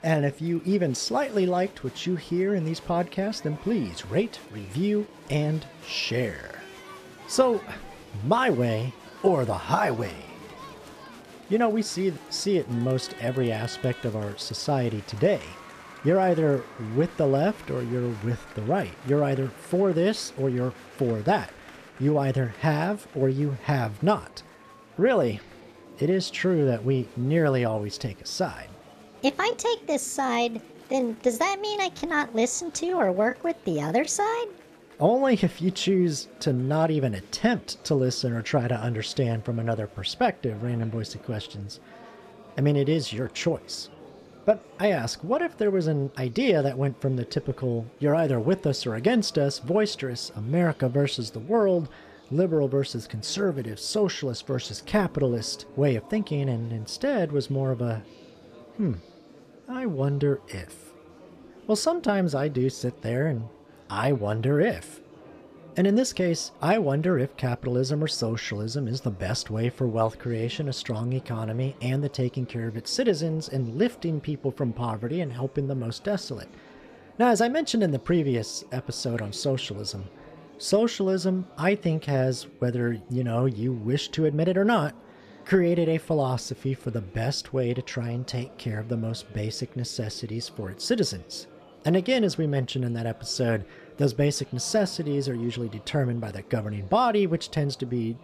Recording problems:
murmuring crowd; faint; throughout; 20 dB below the speech

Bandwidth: 14.5 kHz